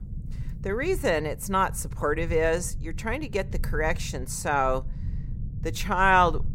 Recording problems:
low rumble; faint; throughout; 25 dB below the speech

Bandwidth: 16 kHz